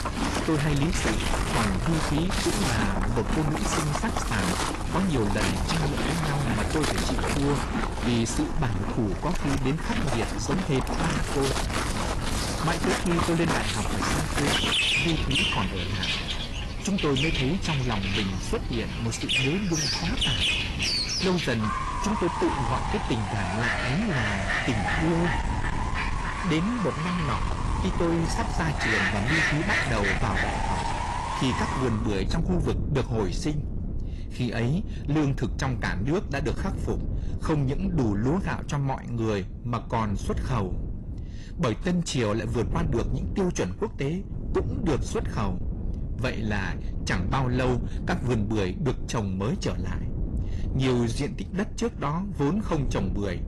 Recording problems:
distortion; heavy; 7 dB below the speech
garbled, watery; slightly; nothing above 11.5 kHz
animal sounds; very loud; until 32 s; as loud as the speech
wind noise on the microphone; occasional gusts; 10 dB below the speech

